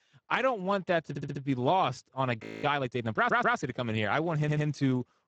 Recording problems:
garbled, watery; badly; nothing above 7.5 kHz
audio stuttering; at 1 s, at 3 s and at 4.5 s
audio freezing; at 2.5 s

